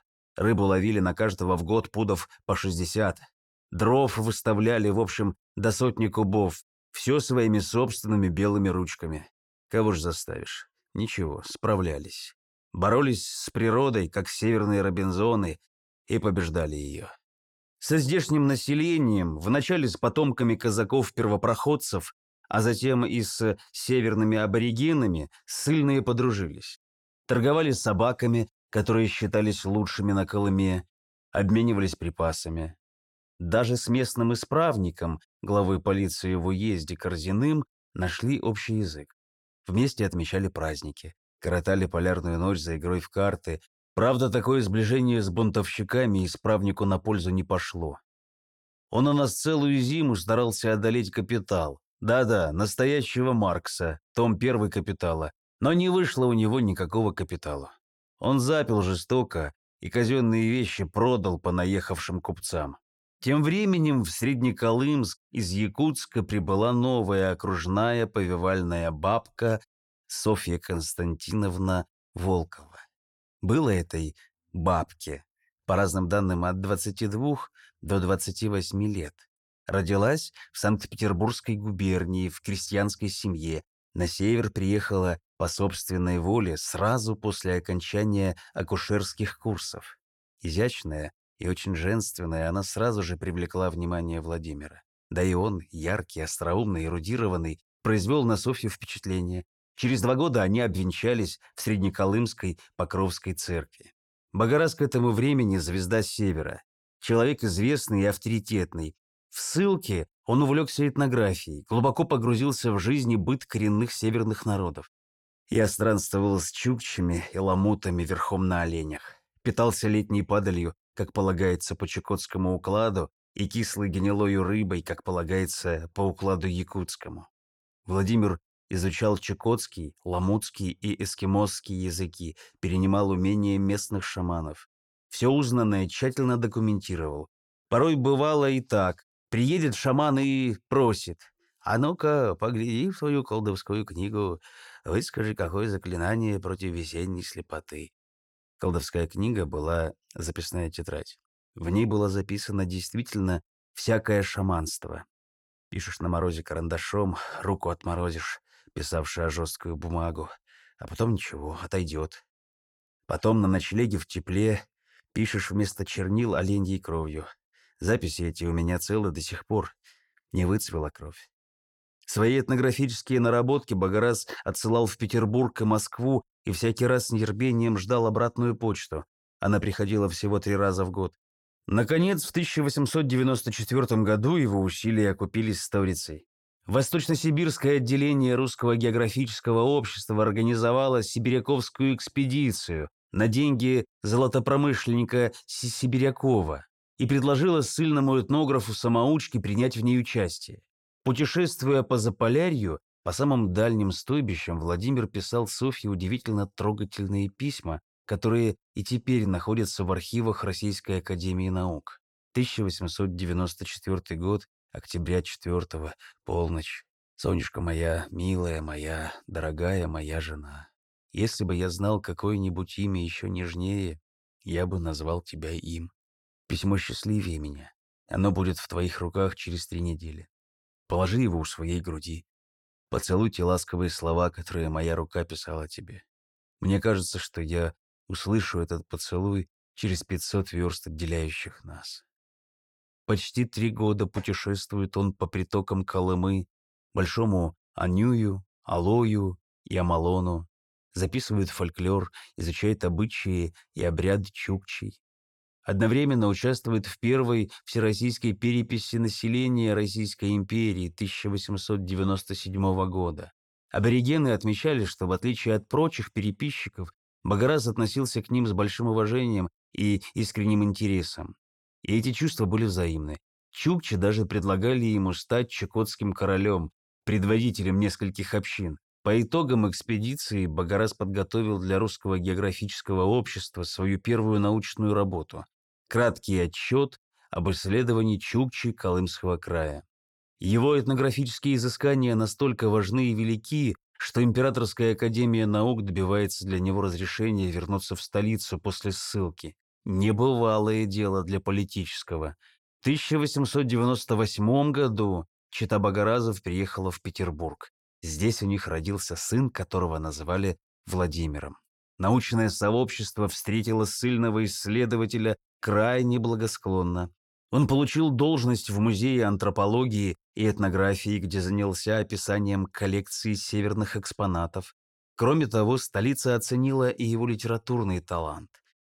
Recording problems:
none

